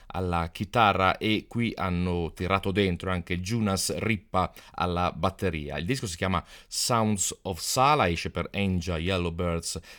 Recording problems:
none

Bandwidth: 18.5 kHz